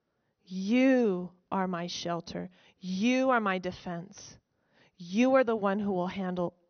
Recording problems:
high frequencies cut off; noticeable; nothing above 6 kHz

